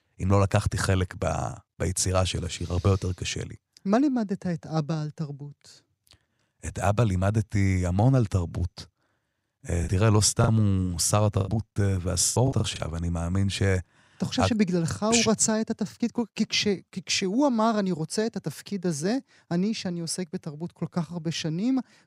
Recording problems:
choppy; very; from 10 to 13 s; 12% of the speech affected

